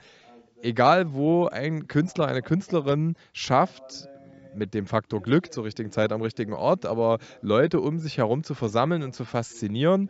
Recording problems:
high frequencies cut off; noticeable; nothing above 8 kHz
voice in the background; faint; throughout; 30 dB below the speech

